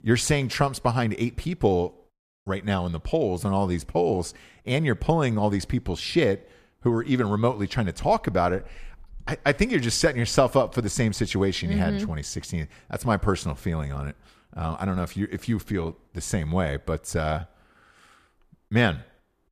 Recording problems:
none

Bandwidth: 14.5 kHz